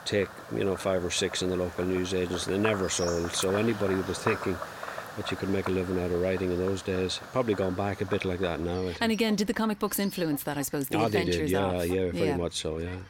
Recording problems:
animal sounds; noticeable; throughout; 10 dB below the speech

